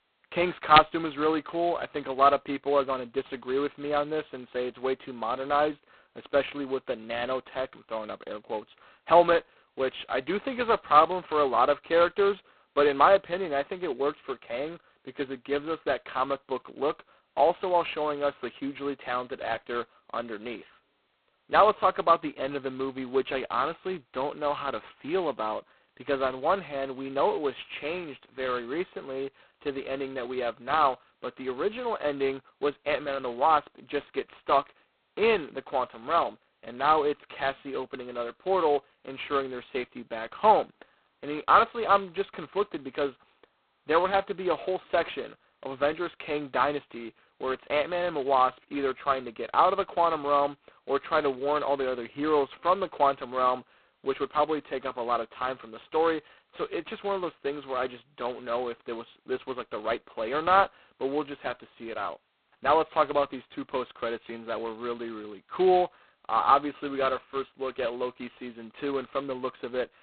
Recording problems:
phone-call audio; poor line; nothing above 4 kHz

